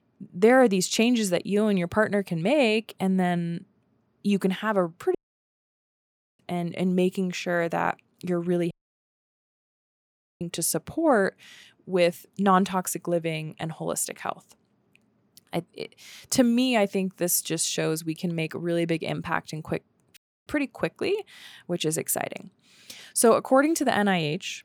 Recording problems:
audio cutting out; at 5 s for 1 s, at 8.5 s for 1.5 s and at 20 s

